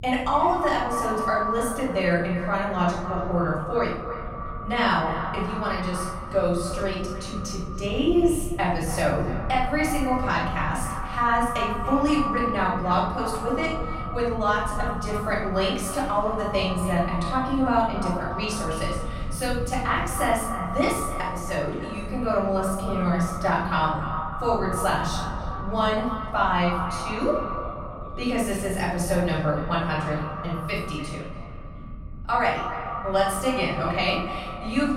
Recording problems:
echo of what is said; strong; throughout; 290 ms later, 7 dB below the speech
off-mic speech; far
room echo; noticeable; dies away in 0.7 s
voice in the background; faint; throughout; 25 dB below the speech
low rumble; faint; throughout; 25 dB below the speech

